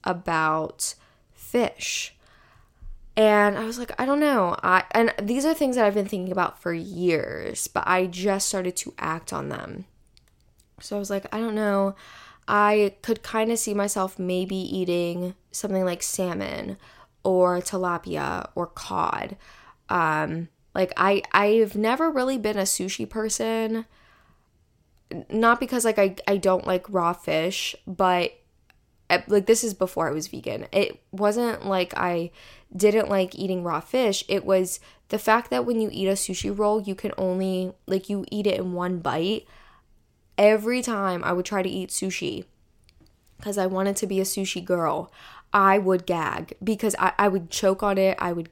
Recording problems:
none

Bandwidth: 16.5 kHz